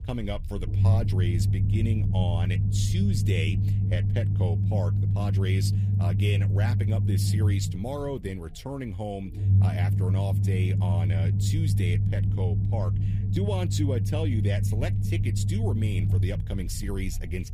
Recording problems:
low rumble; loud; throughout; 3 dB below the speech

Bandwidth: 15 kHz